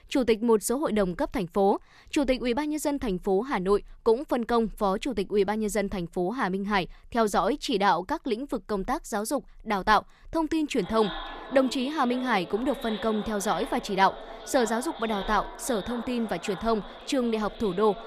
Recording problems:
echo of what is said; noticeable; from 11 s on; 550 ms later, 15 dB below the speech

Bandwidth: 14.5 kHz